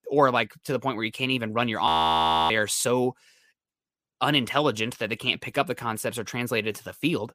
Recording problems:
audio freezing; at 2 s for 0.5 s

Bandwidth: 15 kHz